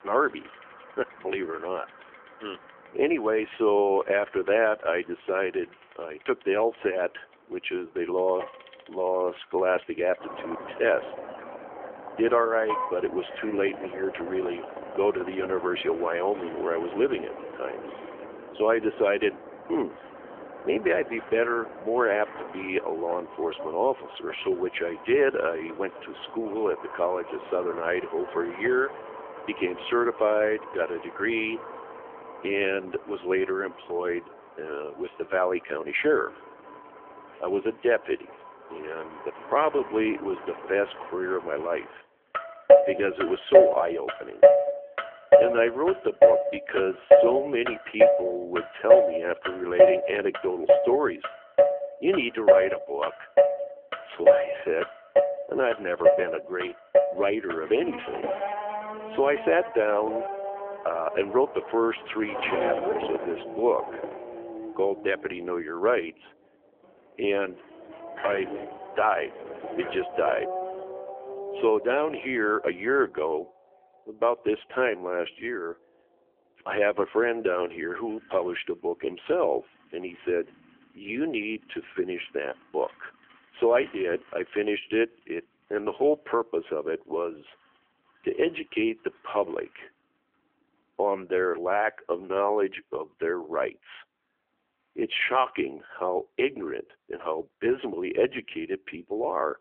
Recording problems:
phone-call audio; nothing above 3.5 kHz
traffic noise; very loud; throughout; 2 dB above the speech
door banging; noticeable; from 1:08 to 1:11; peak 8 dB below the speech

